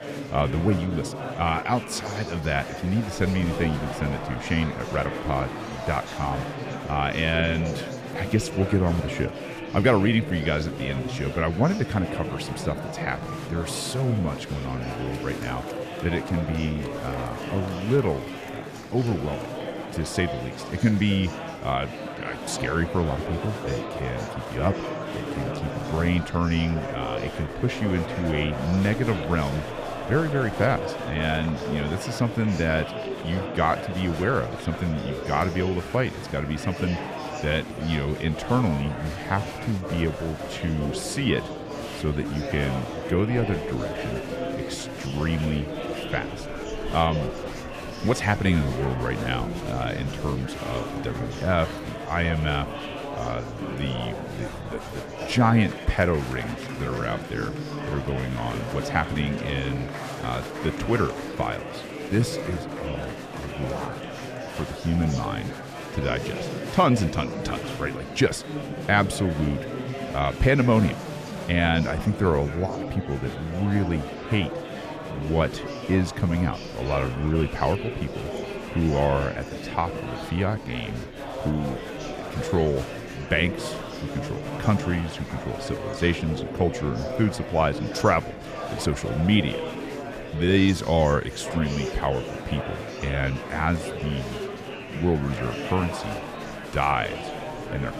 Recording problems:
murmuring crowd; loud; throughout; 7 dB below the speech

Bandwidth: 14.5 kHz